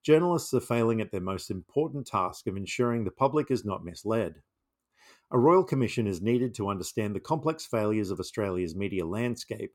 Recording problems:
none

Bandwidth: 17 kHz